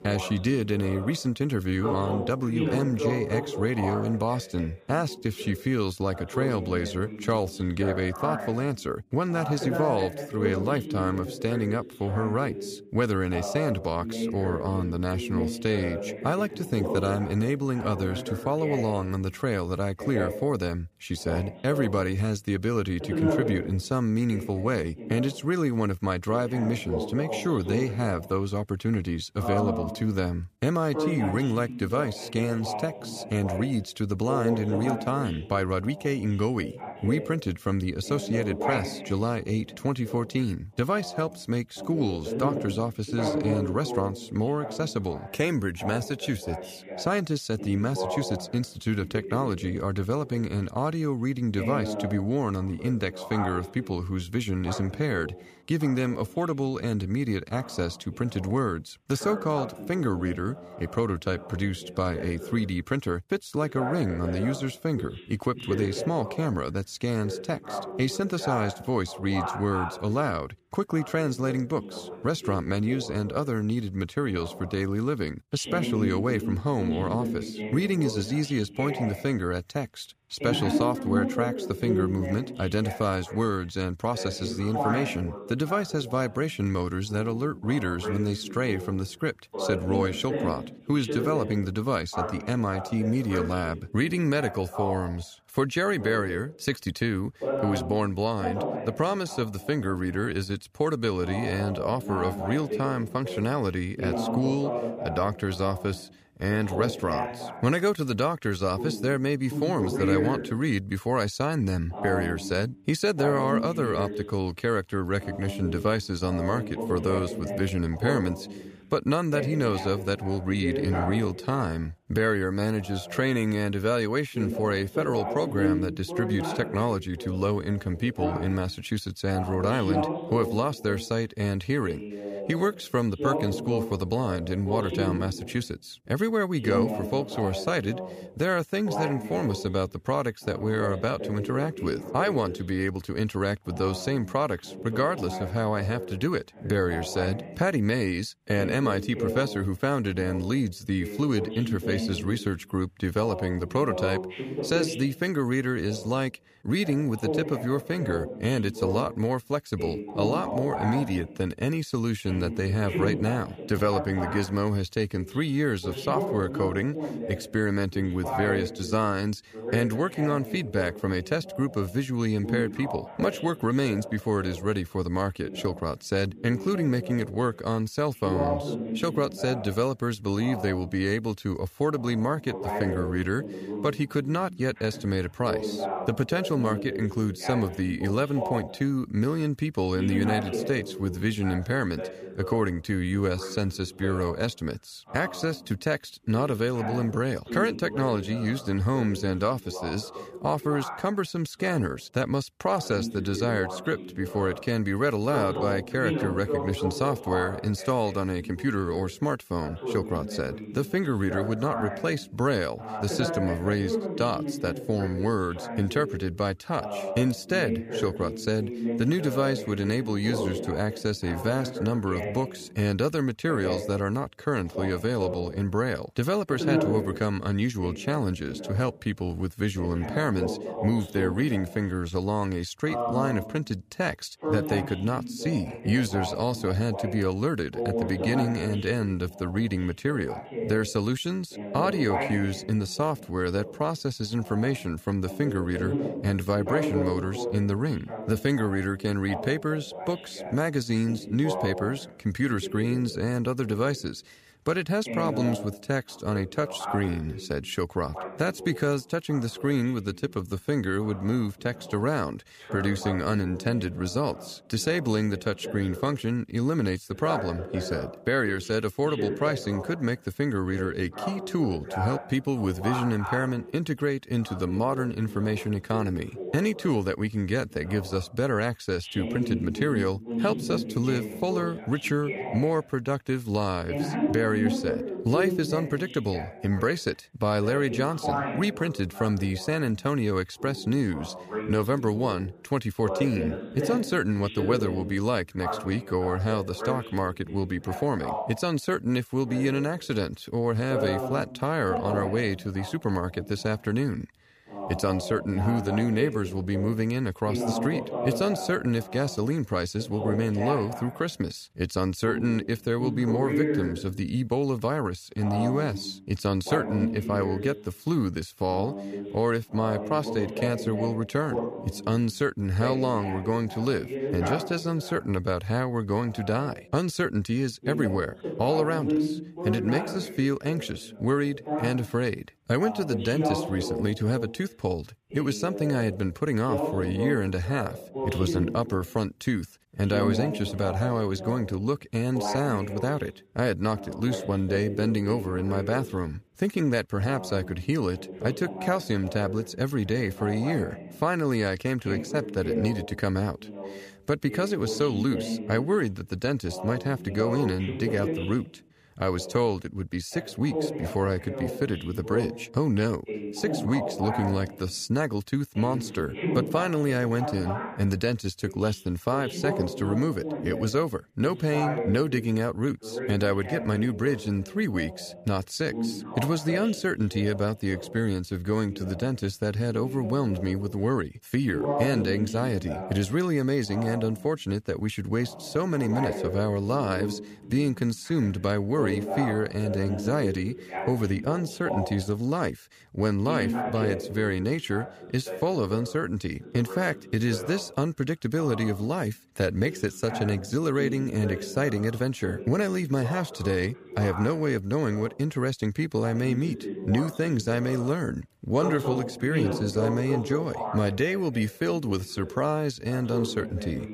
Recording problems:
voice in the background; loud; throughout; 7 dB below the speech

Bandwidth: 15 kHz